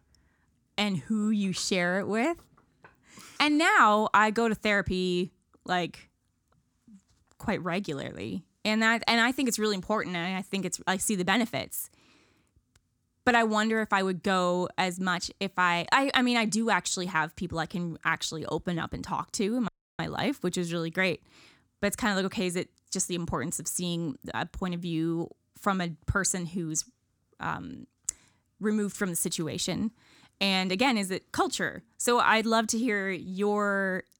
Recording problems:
audio cutting out; at 20 s

